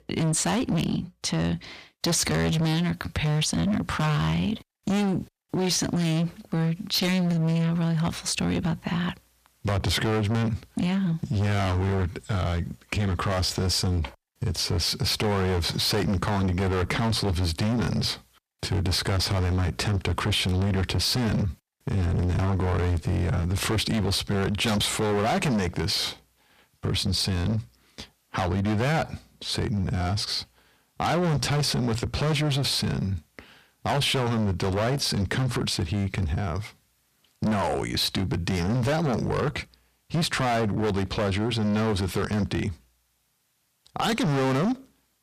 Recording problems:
distortion; heavy; 21% of the sound clipped
squashed, flat; somewhat

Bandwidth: 14.5 kHz